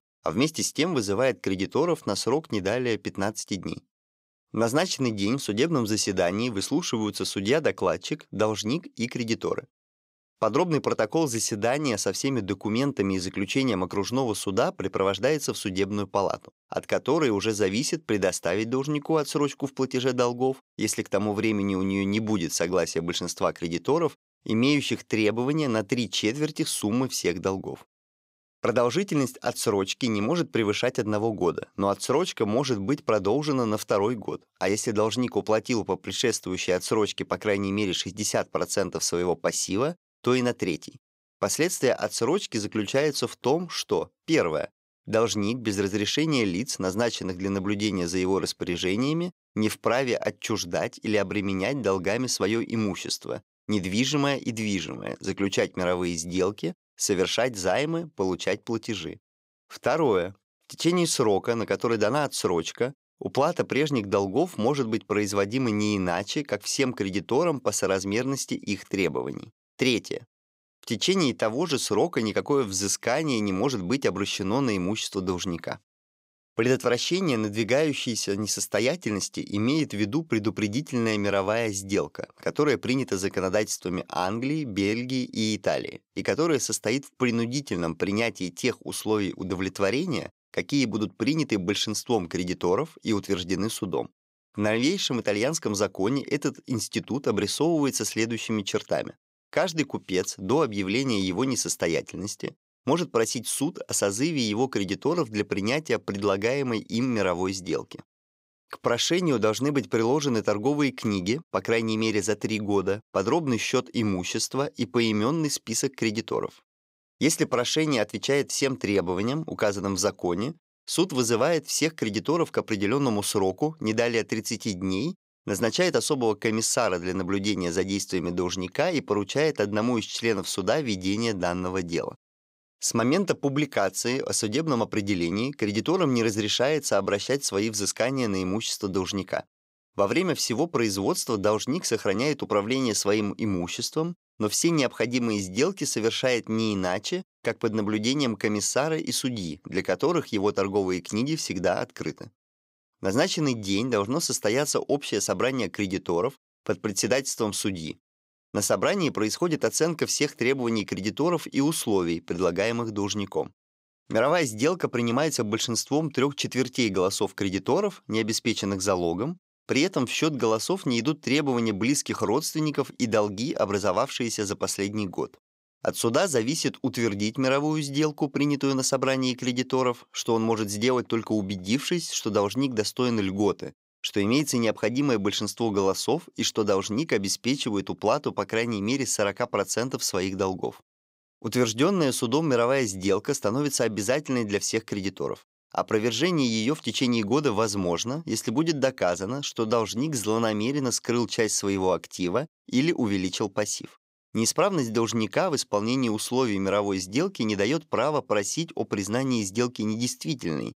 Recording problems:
none

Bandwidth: 15.5 kHz